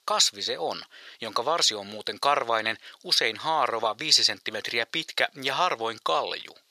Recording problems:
thin; very; fading below 600 Hz

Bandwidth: 14.5 kHz